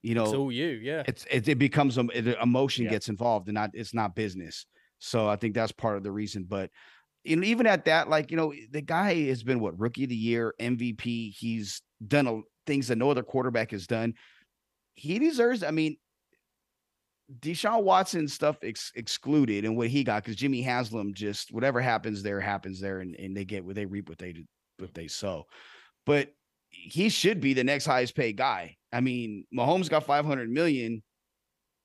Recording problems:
none

